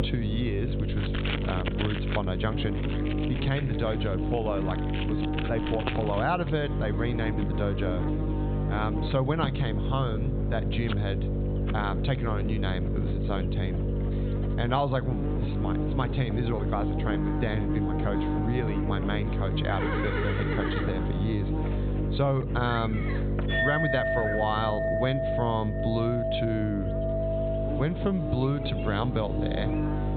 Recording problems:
high frequencies cut off; severe; nothing above 4 kHz
squashed, flat; somewhat
electrical hum; loud; throughout; 50 Hz, 5 dB below the speech
animal sounds; loud; throughout; 9 dB below the speech
household noises; loud; throughout; 3 dB below the speech

